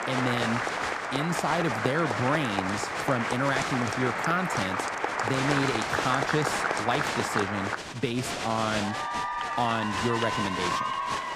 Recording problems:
crowd noise; very loud; throughout; 1 dB above the speech

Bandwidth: 14.5 kHz